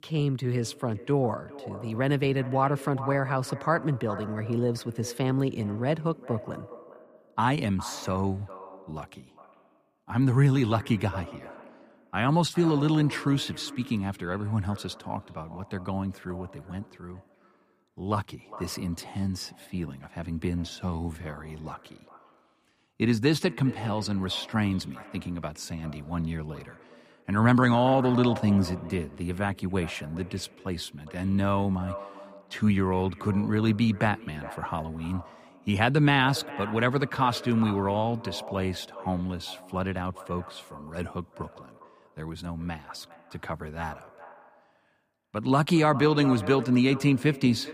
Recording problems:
echo of what is said; noticeable; throughout; 410 ms later, 15 dB below the speech

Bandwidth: 15 kHz